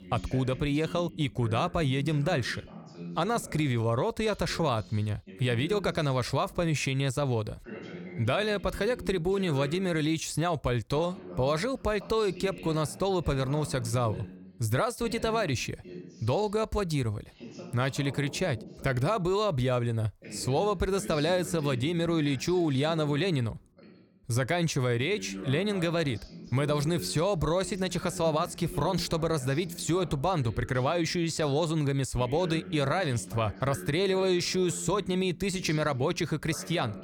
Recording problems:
voice in the background; noticeable; throughout; 15 dB below the speech

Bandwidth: 19 kHz